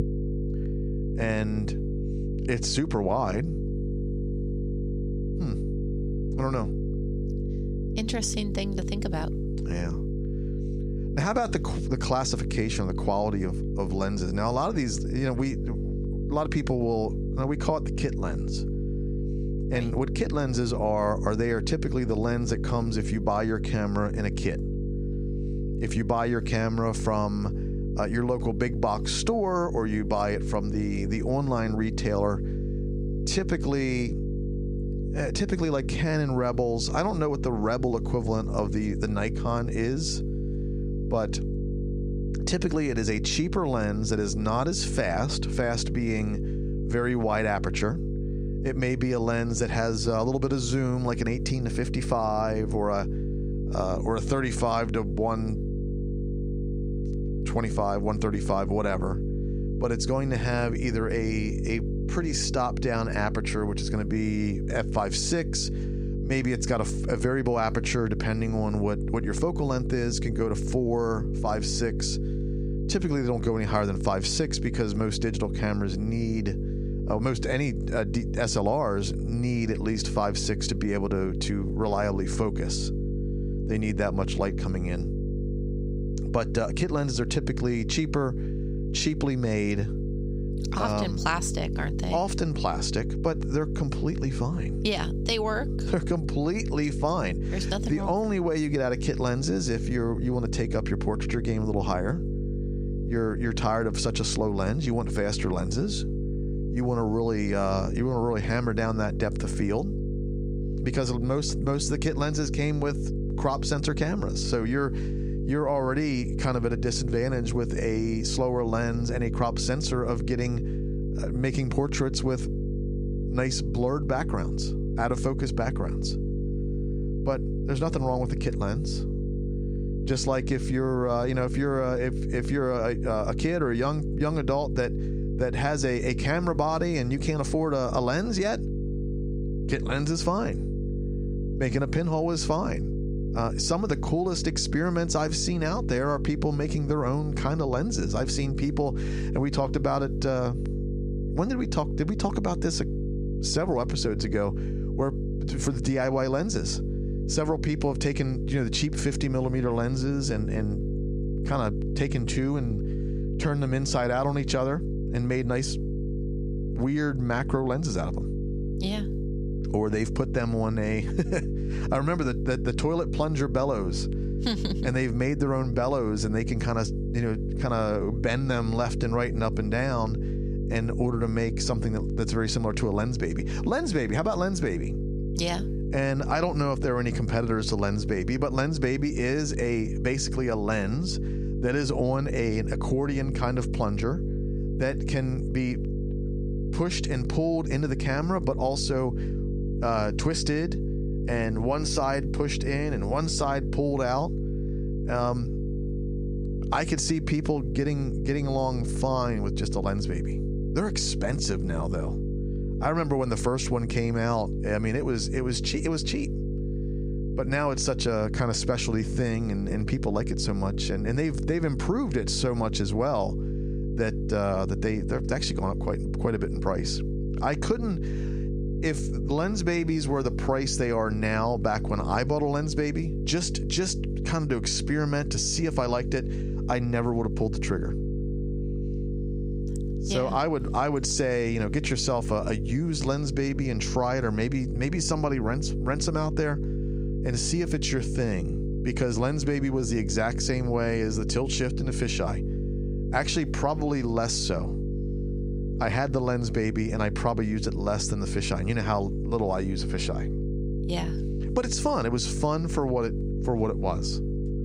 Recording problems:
squashed, flat; somewhat
electrical hum; noticeable; throughout; 50 Hz, 10 dB below the speech

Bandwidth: 15.5 kHz